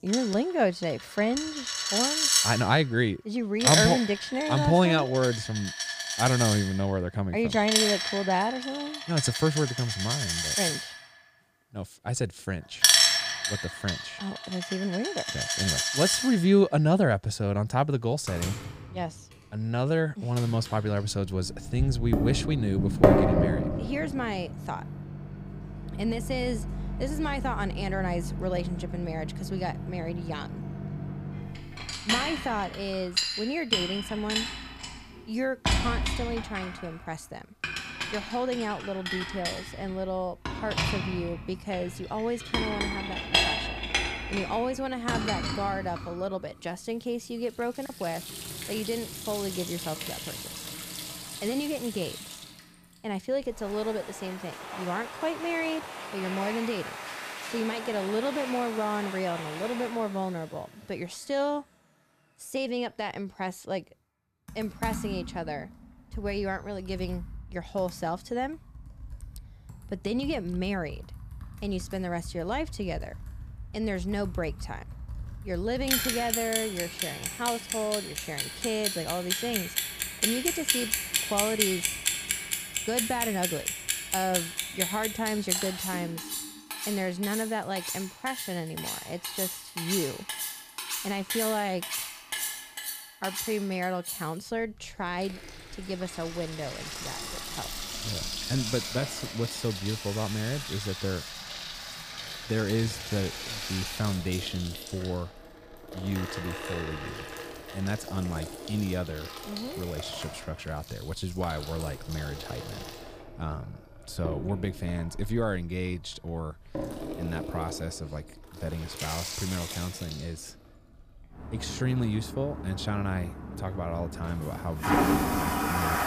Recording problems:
household noises; very loud; throughout; as loud as the speech

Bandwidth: 15 kHz